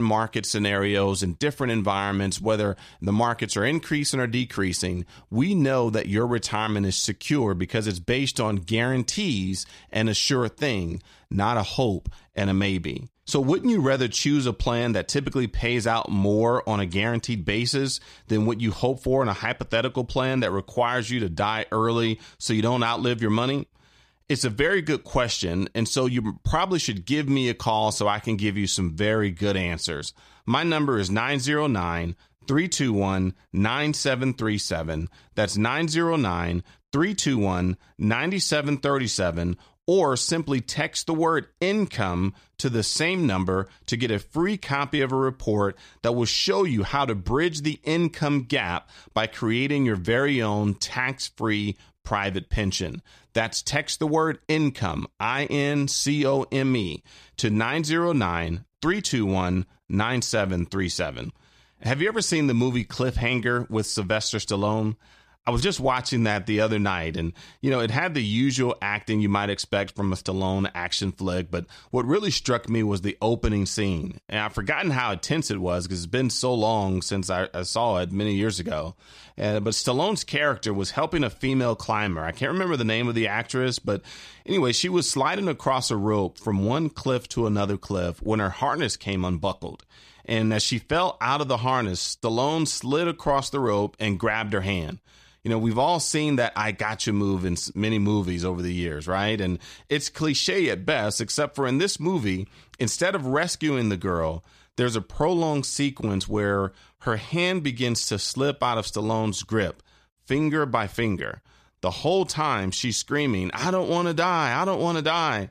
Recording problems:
abrupt cut into speech; at the start

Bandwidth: 14.5 kHz